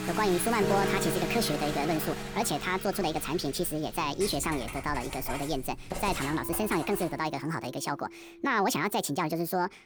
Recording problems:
wrong speed and pitch; too fast and too high; 1.5 times normal speed
household noises; loud; until 7 s; 9 dB below the speech
background music; loud; throughout; 8 dB below the speech

